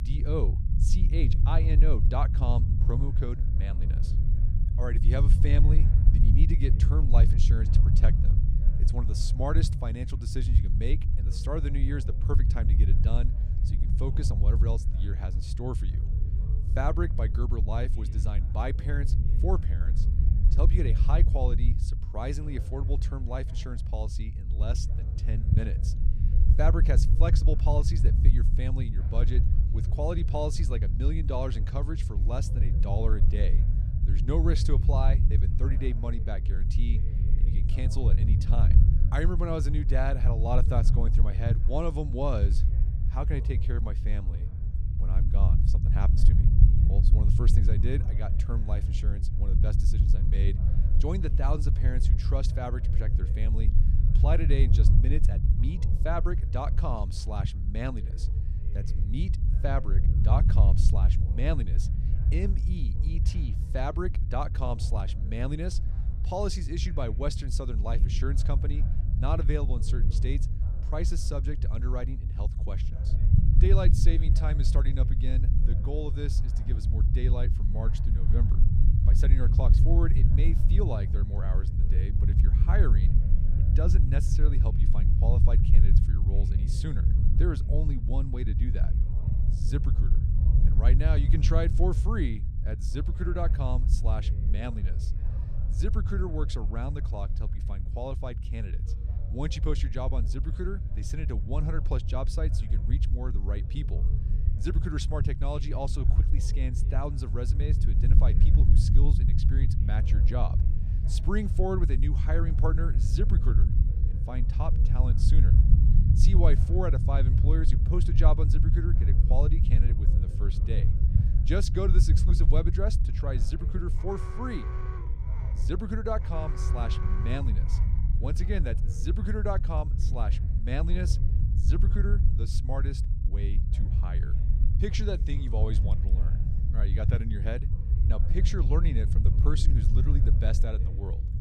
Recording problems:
low rumble; loud; throughout; 6 dB below the speech
voice in the background; faint; throughout; 20 dB below the speech
alarm; noticeable; from 2:04 to 2:08; peak 8 dB below the speech

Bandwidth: 15 kHz